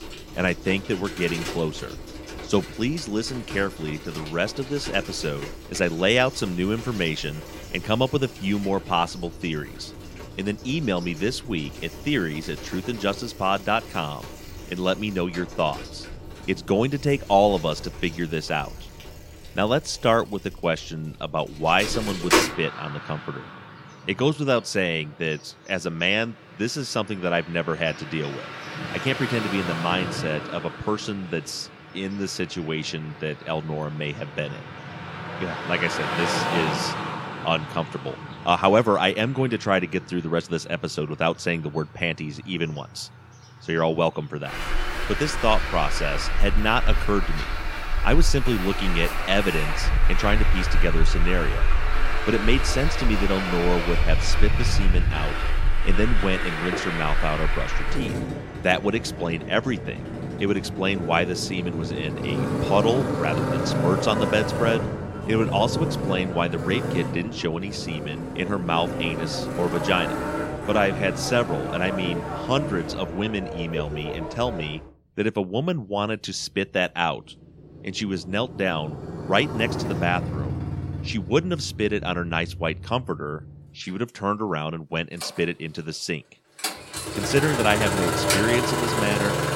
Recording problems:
traffic noise; loud; throughout; 3 dB below the speech

